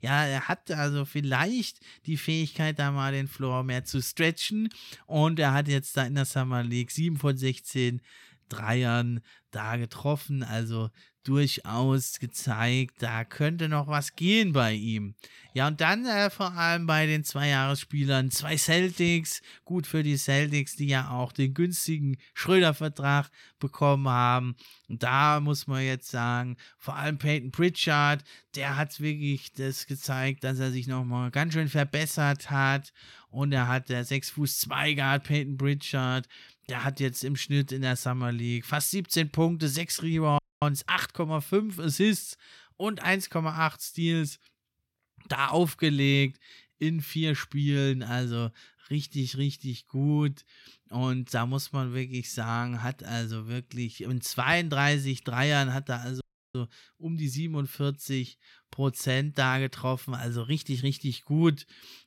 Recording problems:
audio cutting out; at 40 s and at 56 s

